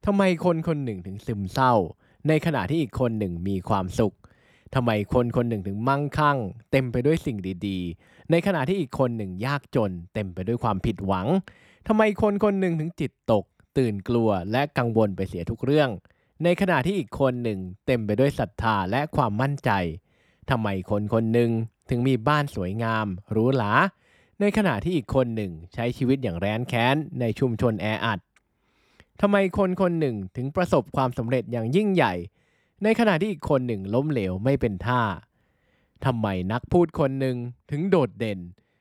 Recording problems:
none

